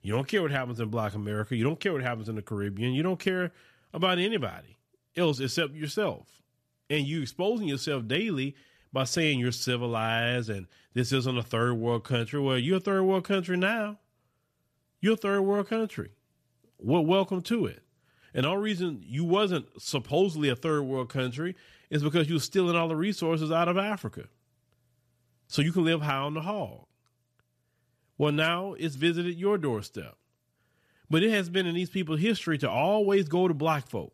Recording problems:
none

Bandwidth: 14.5 kHz